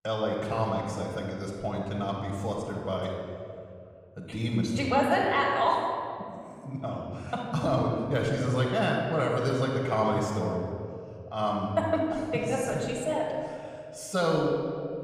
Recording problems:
room echo; noticeable; dies away in 2.1 s
off-mic speech; somewhat distant

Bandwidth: 15 kHz